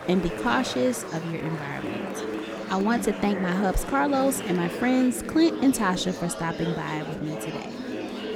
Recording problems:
murmuring crowd; loud; throughout; 8 dB below the speech

